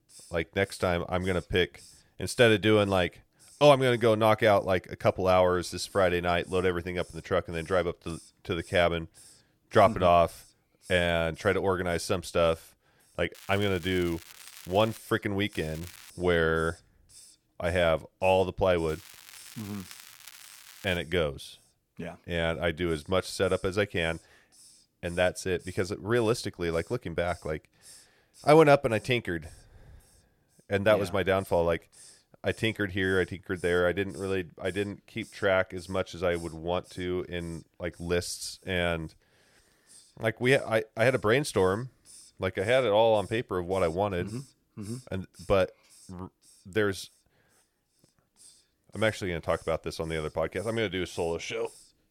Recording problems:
crackling; noticeable; from 13 to 15 s, at 16 s and from 19 to 21 s; 20 dB below the speech
hiss; faint; throughout; 25 dB below the speech

